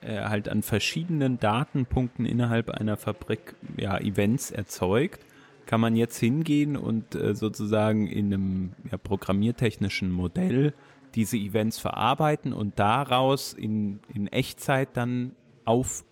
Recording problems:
chatter from many people; faint; throughout; 30 dB below the speech

